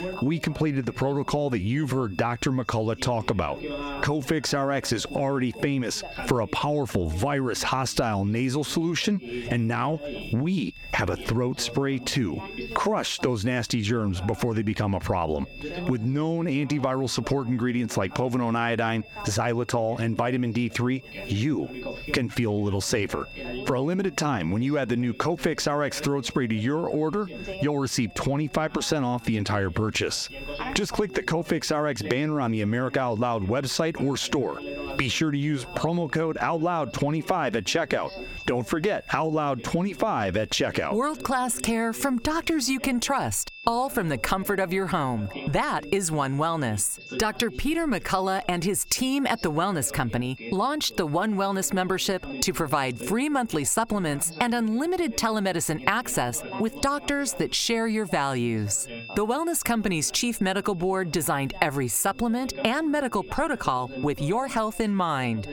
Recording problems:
squashed, flat; somewhat, background pumping
background chatter; noticeable; throughout; 2 voices, 15 dB below the speech
high-pitched whine; faint; throughout; 2.5 kHz, 20 dB below the speech

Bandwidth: 17.5 kHz